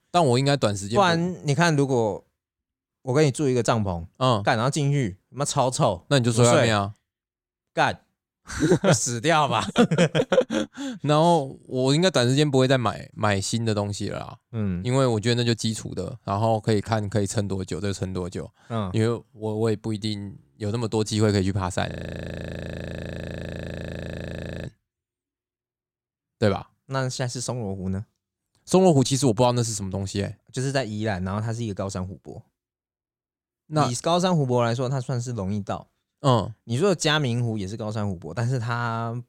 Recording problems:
audio freezing; at 22 s for 3 s

